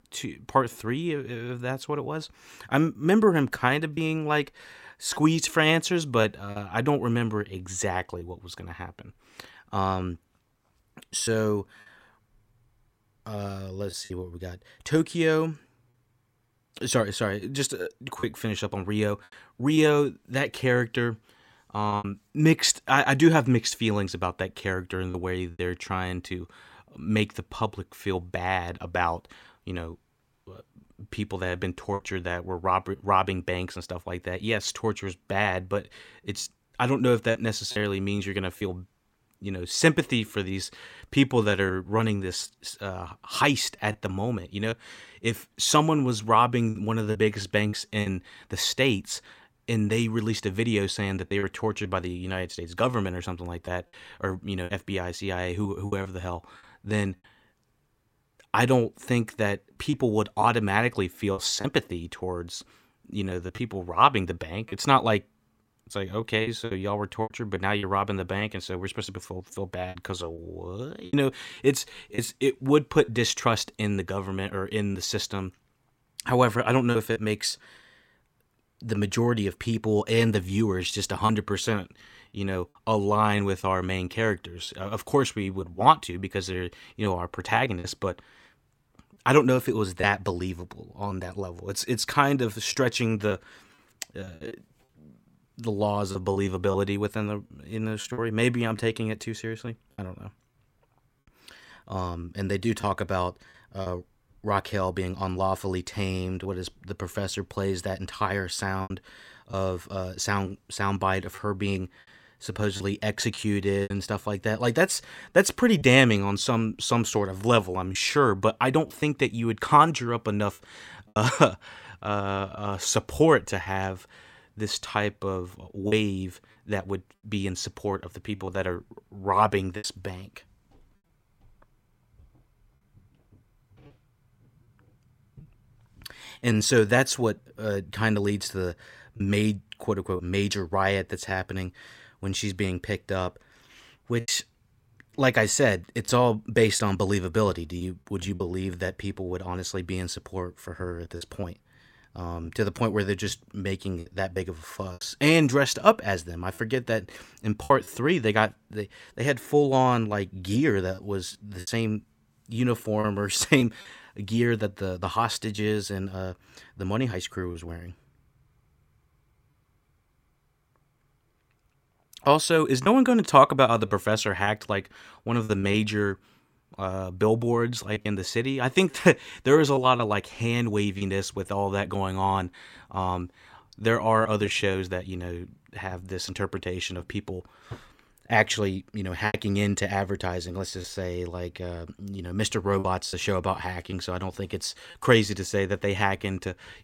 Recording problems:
choppy; occasionally; 4% of the speech affected

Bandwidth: 16.5 kHz